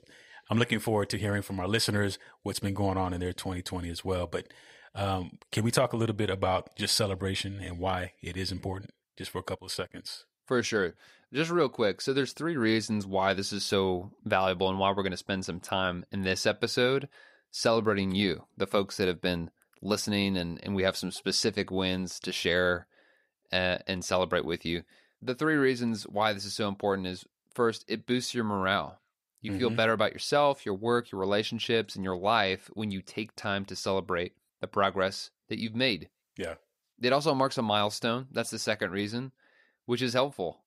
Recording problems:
none

